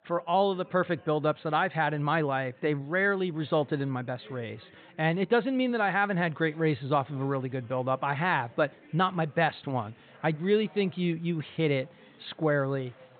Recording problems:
high frequencies cut off; severe; nothing above 4 kHz
chatter from many people; faint; throughout; 30 dB below the speech

